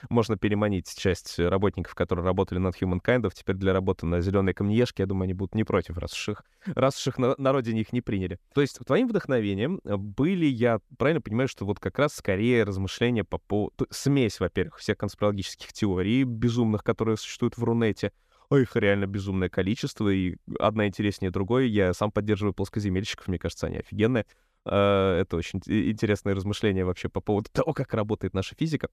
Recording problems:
none

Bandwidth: 14.5 kHz